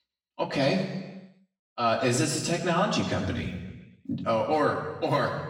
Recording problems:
off-mic speech; far
room echo; noticeable; dies away in 1.1 s

